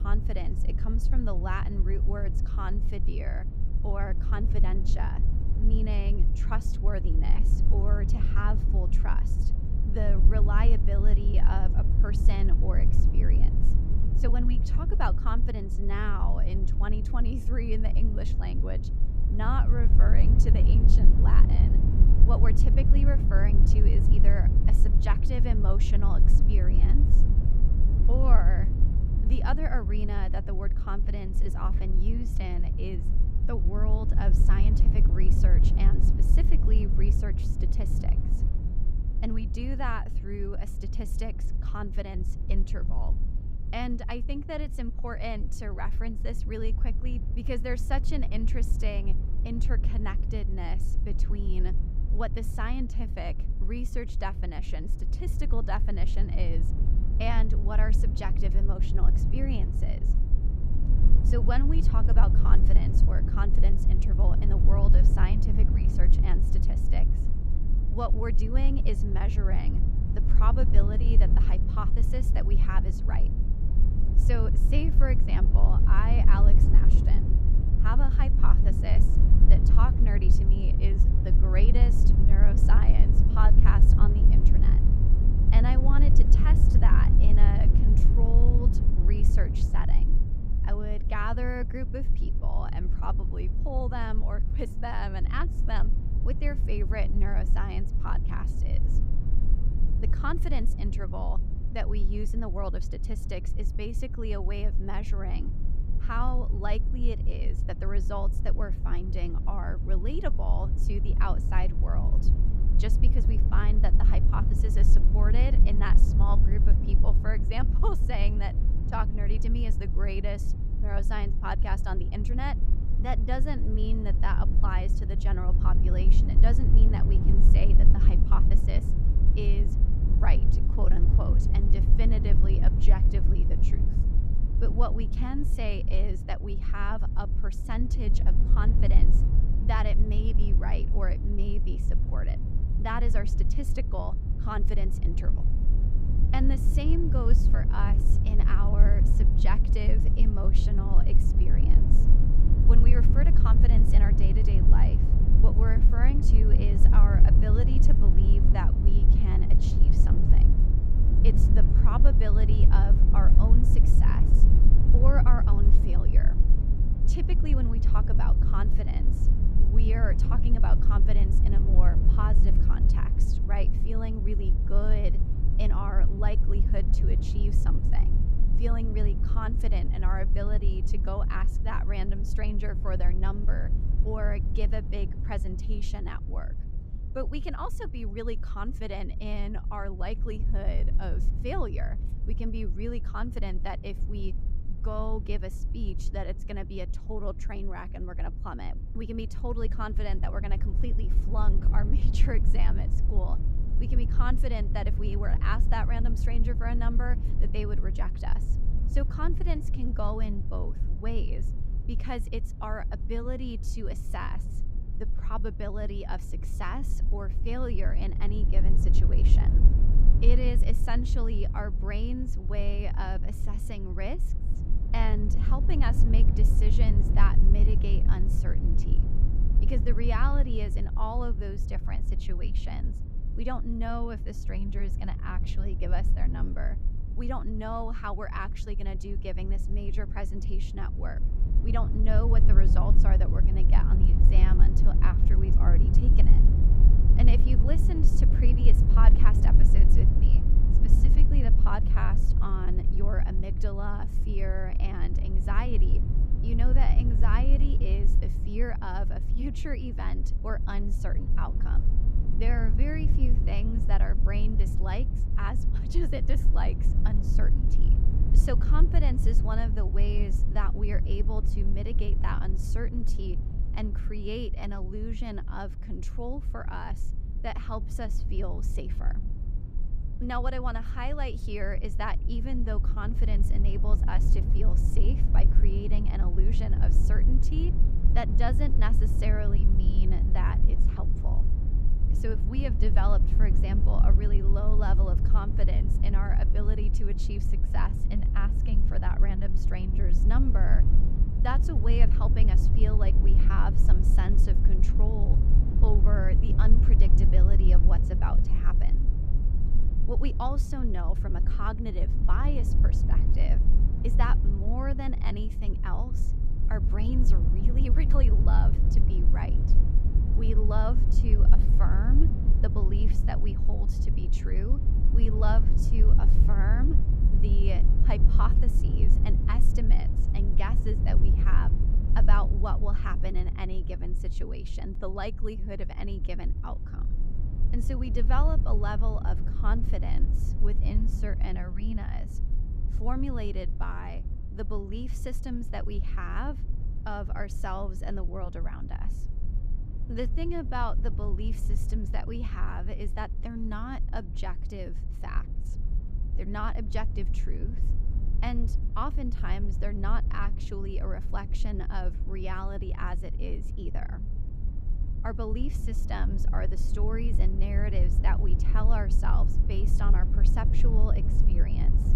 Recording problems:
low rumble; loud; throughout; 6 dB below the speech

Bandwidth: 15.5 kHz